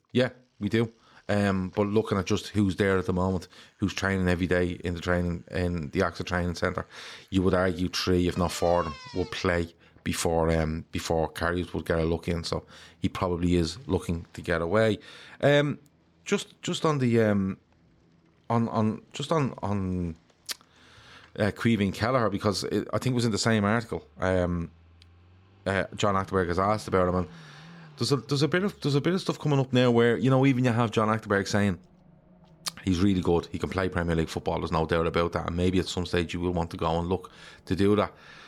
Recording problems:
traffic noise; faint; throughout; 25 dB below the speech

